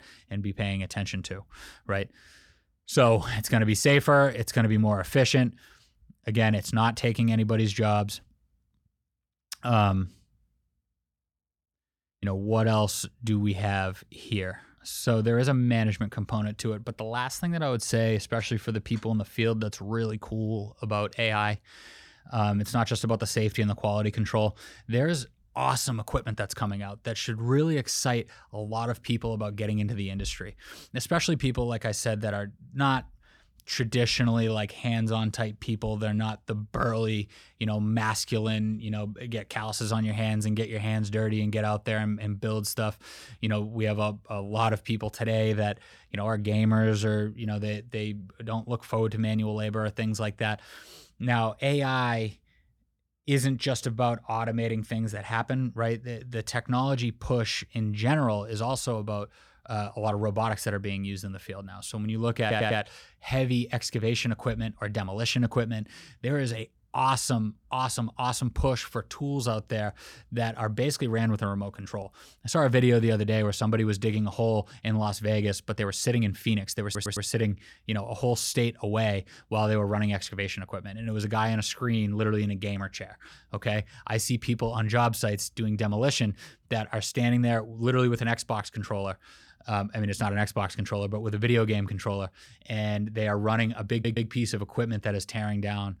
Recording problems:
audio stuttering; at 1:02, at 1:17 and at 1:34

